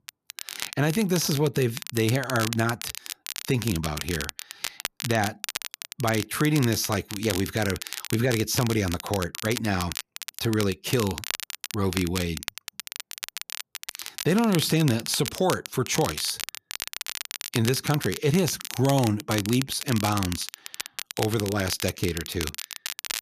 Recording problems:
crackle, like an old record; loud; 8 dB below the speech

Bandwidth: 14.5 kHz